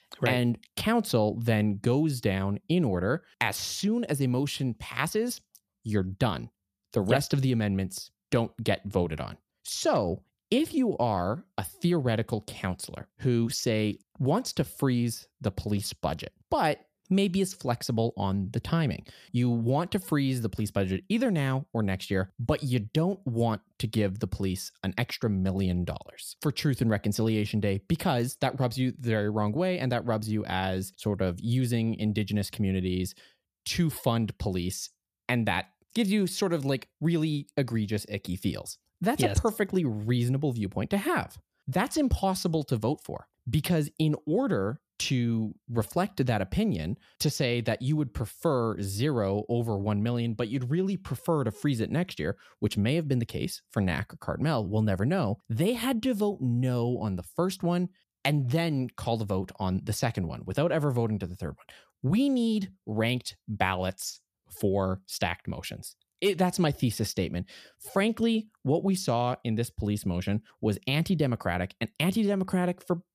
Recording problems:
none

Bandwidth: 14.5 kHz